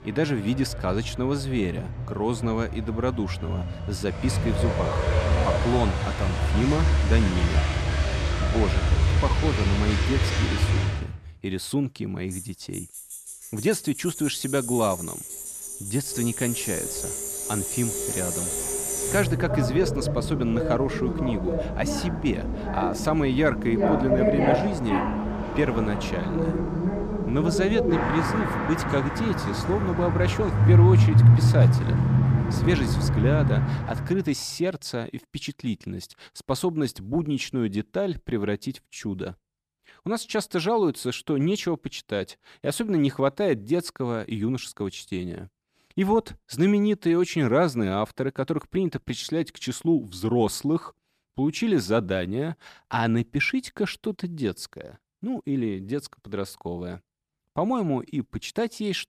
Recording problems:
traffic noise; very loud; until 34 s; 2 dB above the speech

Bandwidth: 14.5 kHz